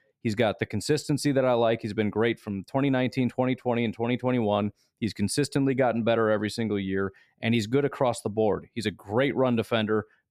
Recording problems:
none

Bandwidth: 14.5 kHz